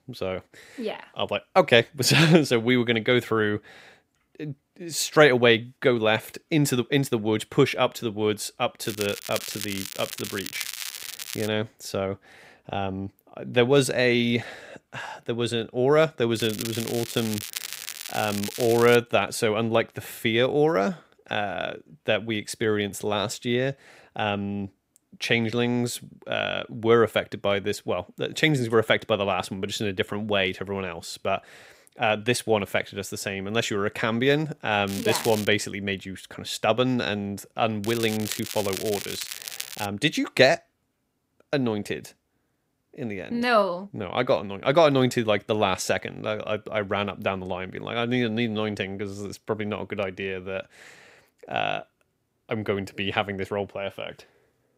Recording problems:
crackling; loud; 4 times, first at 9 s; 9 dB below the speech

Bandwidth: 15.5 kHz